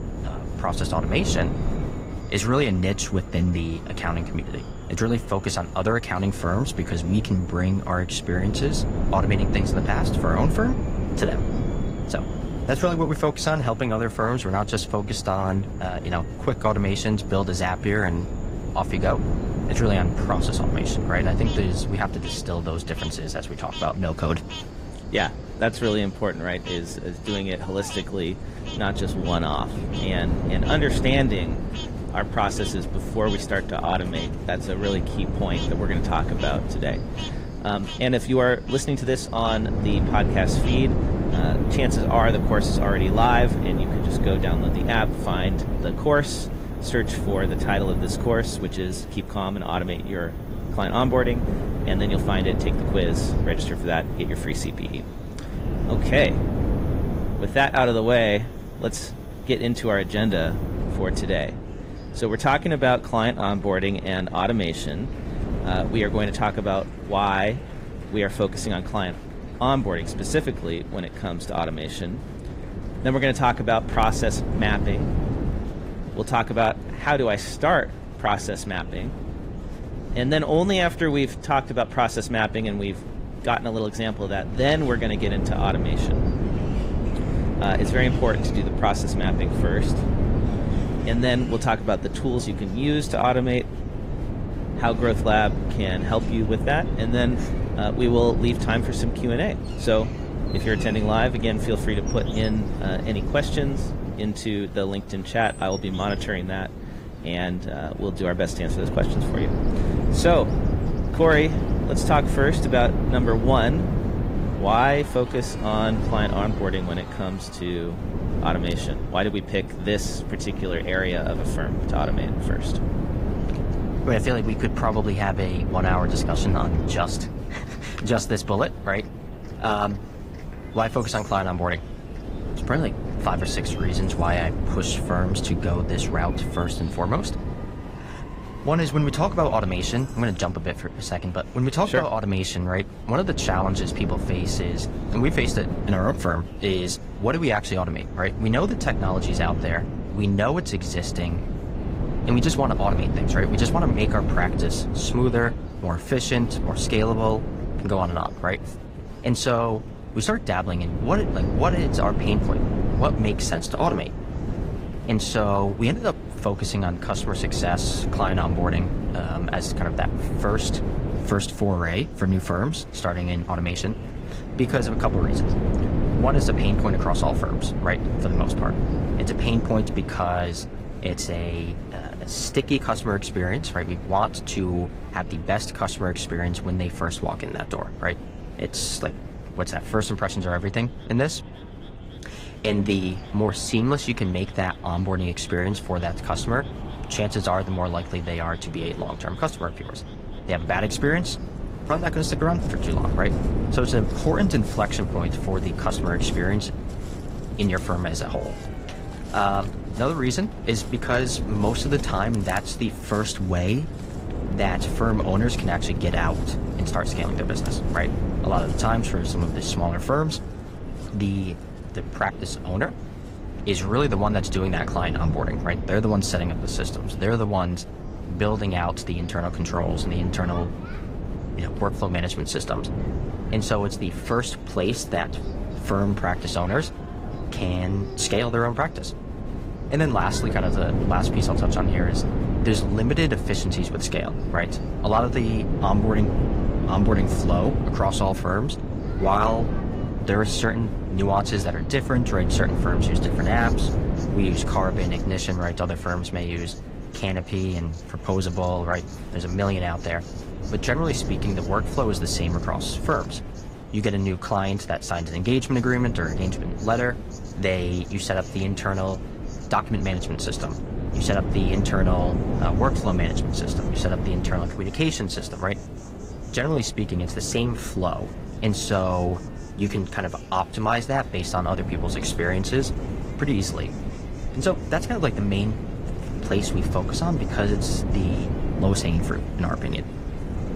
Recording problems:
garbled, watery; slightly; nothing above 15.5 kHz
wind noise on the microphone; heavy; 10 dB below the speech
animal sounds; faint; throughout; 20 dB below the speech
murmuring crowd; faint; throughout; 20 dB below the speech

